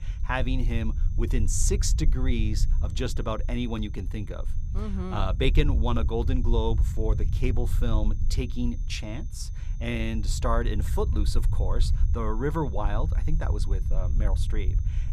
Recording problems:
low rumble; noticeable; throughout; 15 dB below the speech
high-pitched whine; faint; throughout; 6 kHz, 30 dB below the speech

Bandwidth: 14.5 kHz